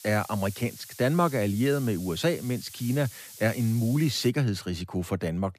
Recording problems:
hiss; noticeable; until 4.5 s; 15 dB below the speech

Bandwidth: 14.5 kHz